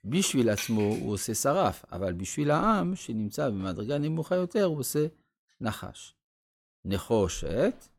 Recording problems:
none

